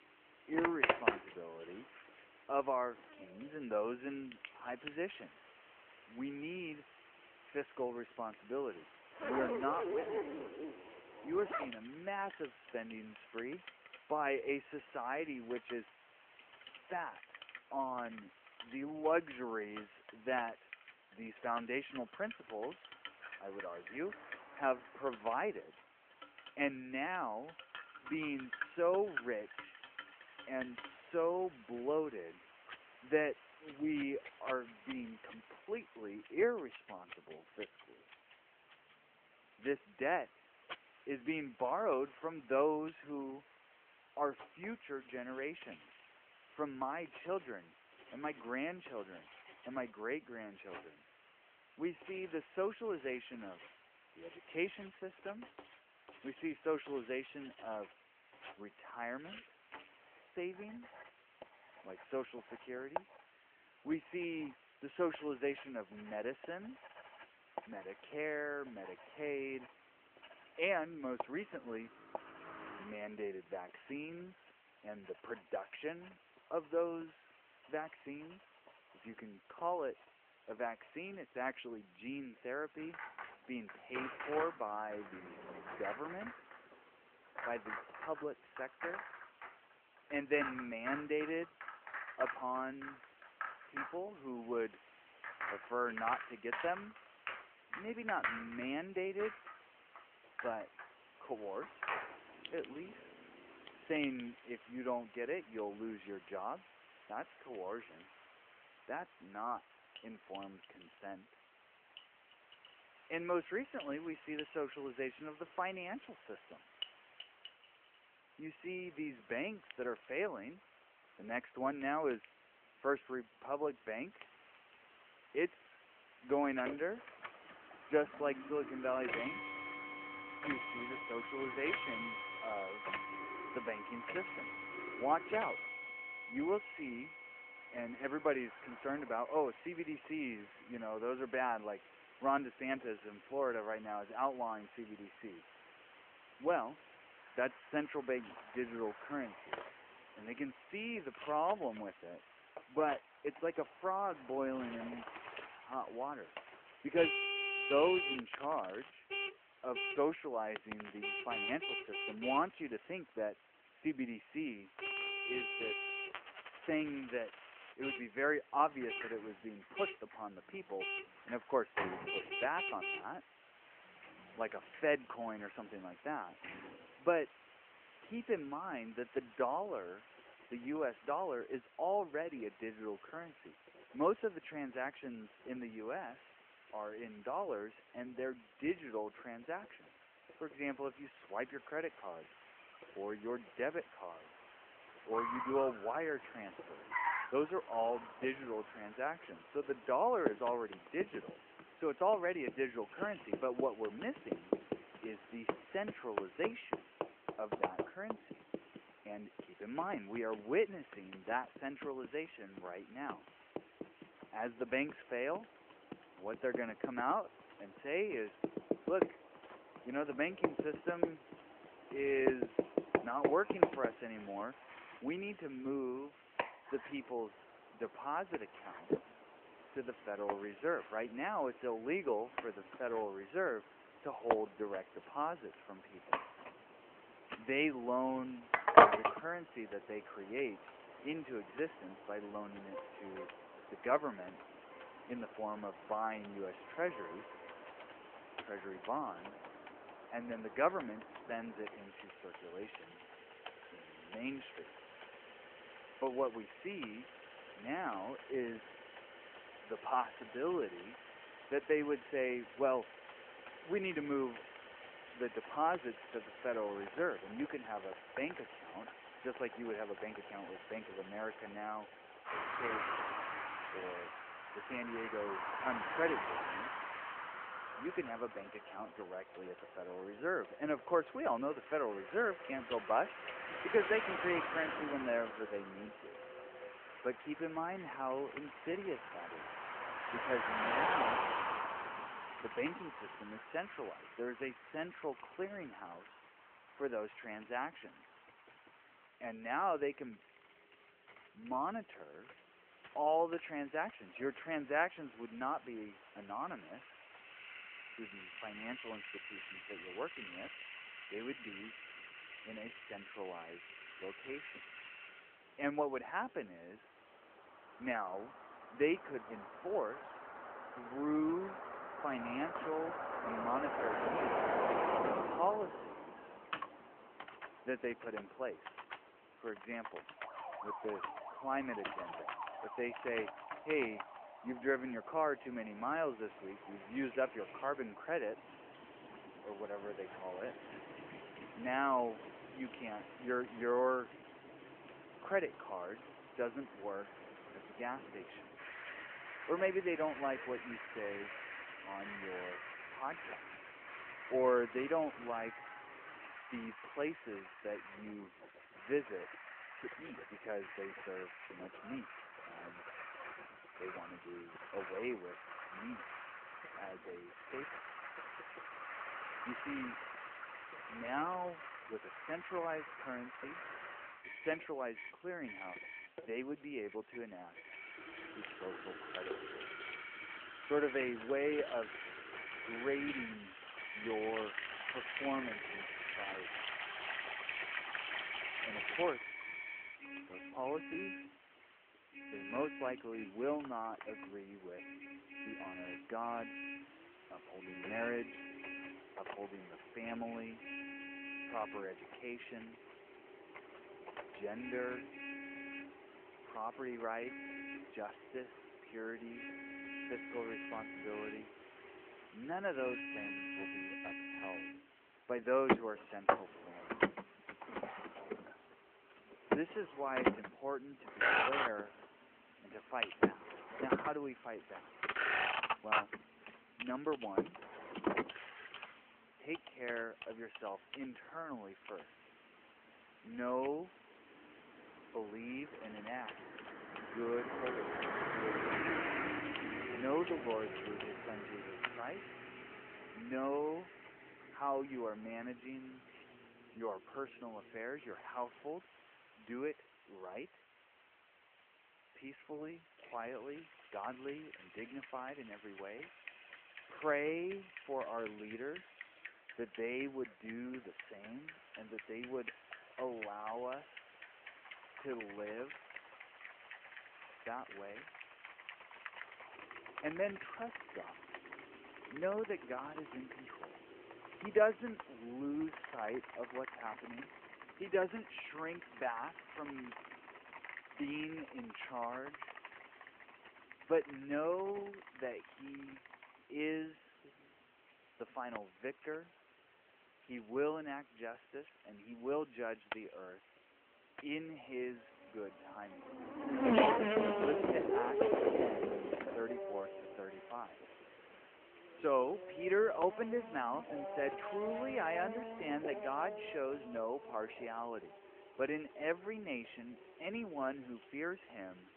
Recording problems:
phone-call audio
household noises; loud; throughout; 5 dB below the speech
traffic noise; loud; throughout; 3 dB below the speech
hiss; faint; throughout; 20 dB below the speech

